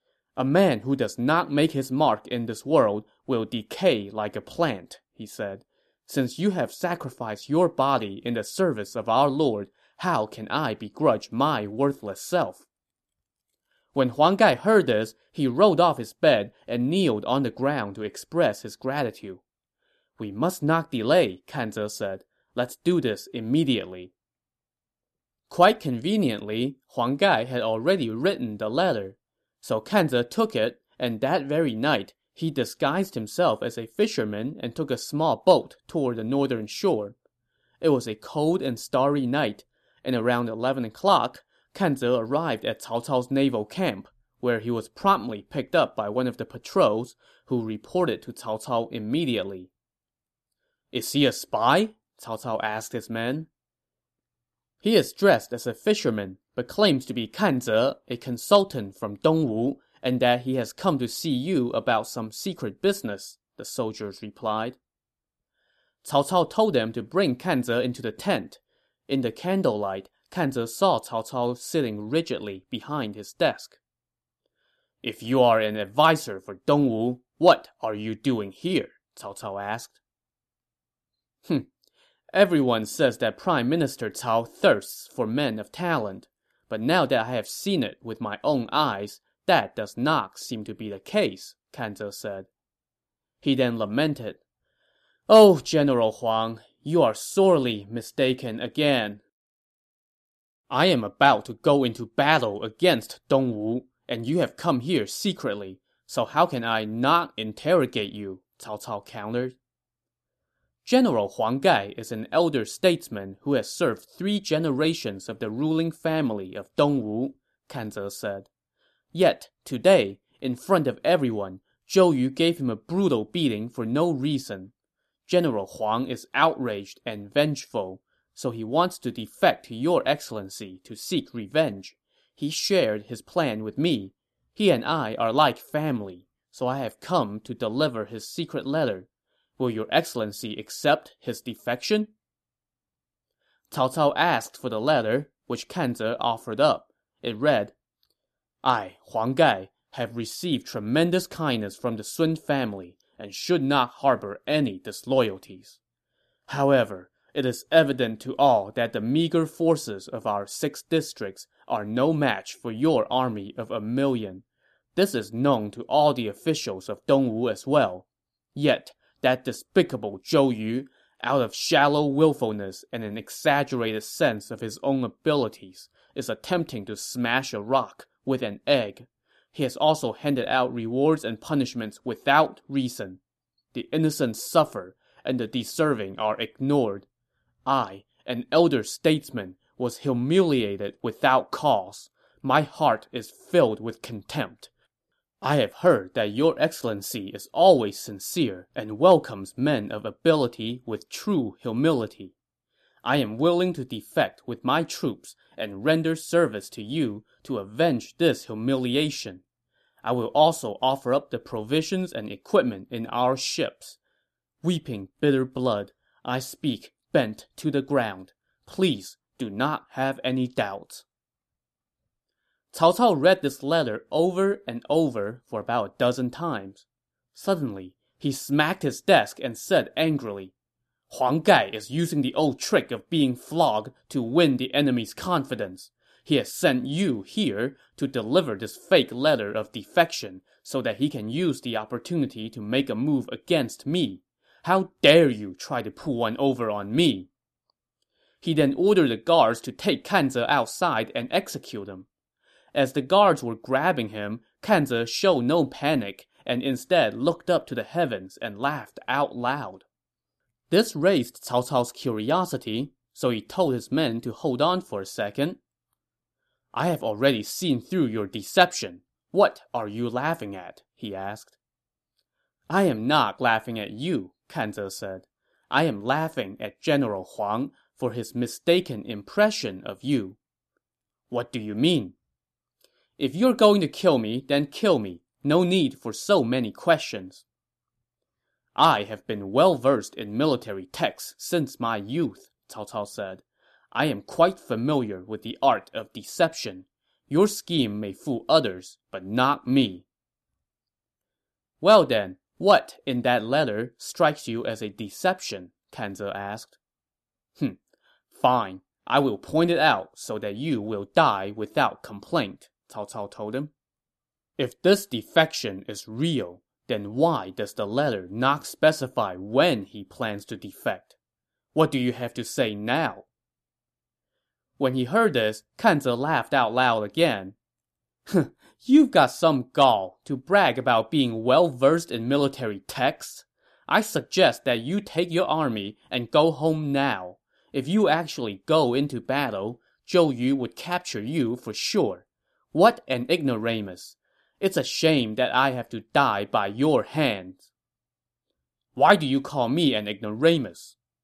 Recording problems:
none

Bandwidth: 13.5 kHz